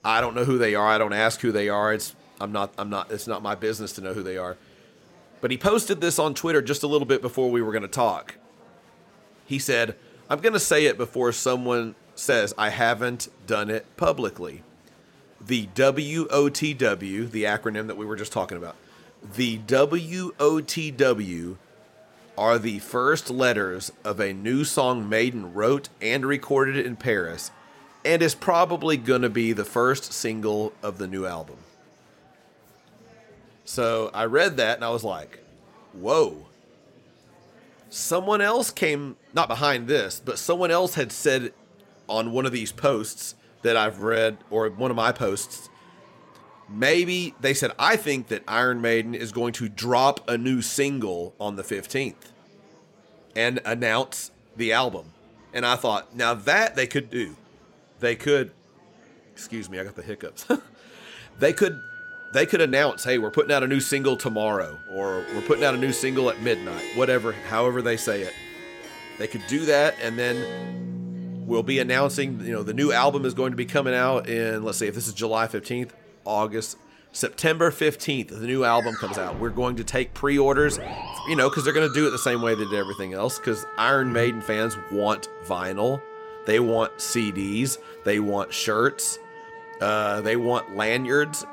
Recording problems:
background music; noticeable; from 1:01 on; 15 dB below the speech
murmuring crowd; faint; throughout; 30 dB below the speech
uneven, jittery; strongly; from 6.5 s to 1:19

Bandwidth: 16.5 kHz